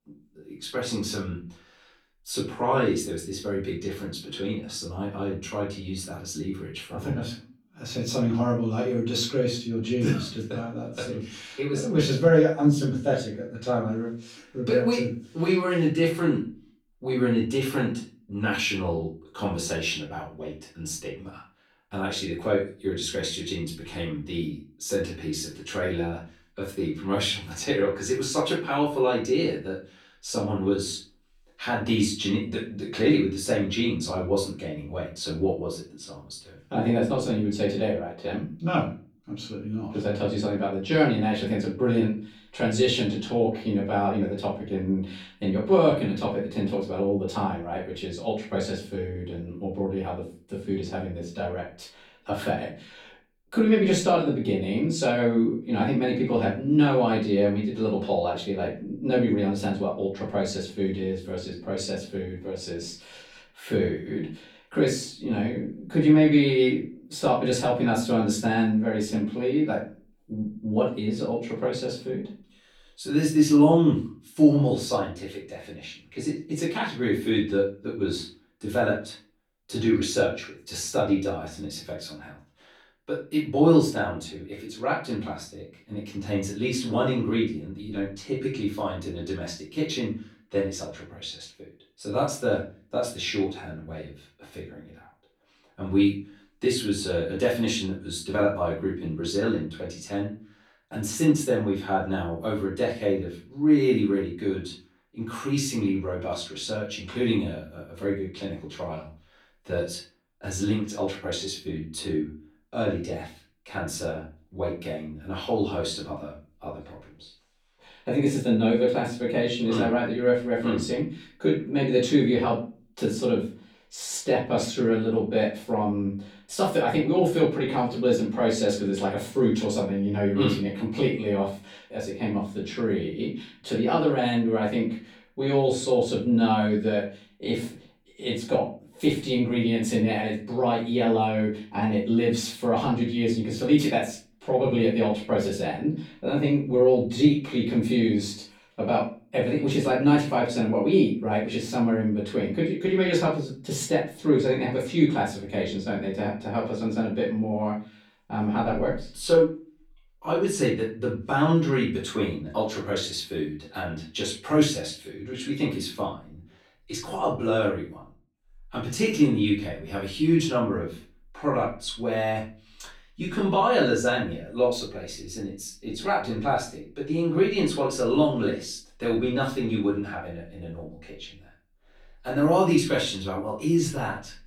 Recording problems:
off-mic speech; far
room echo; slight; dies away in 0.3 s

